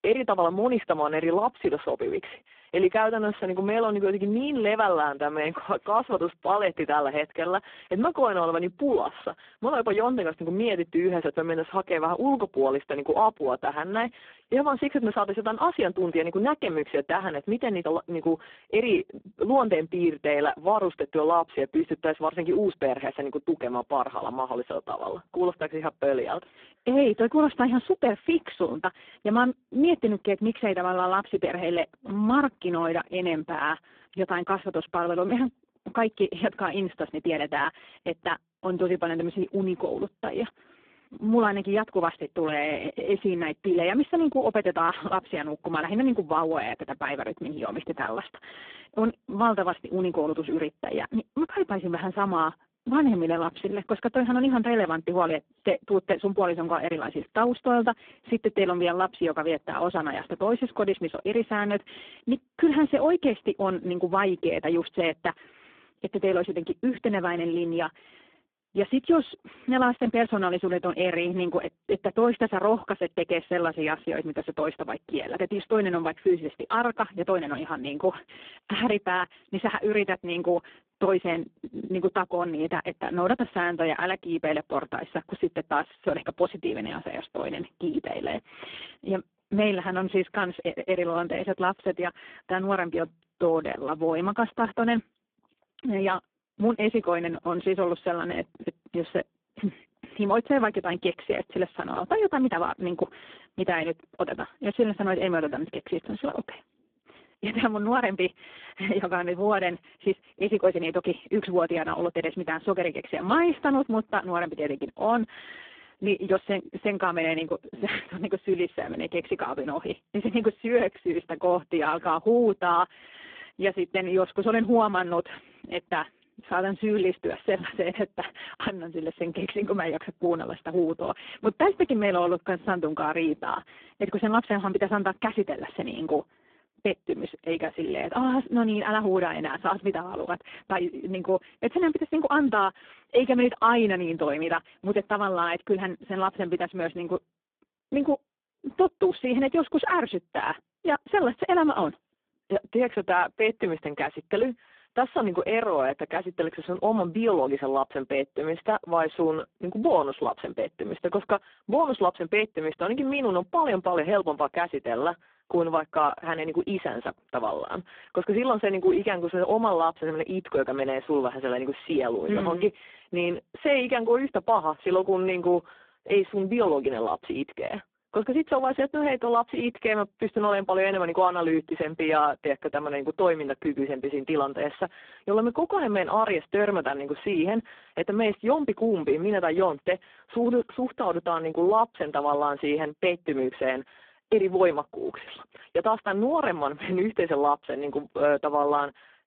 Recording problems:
phone-call audio; poor line

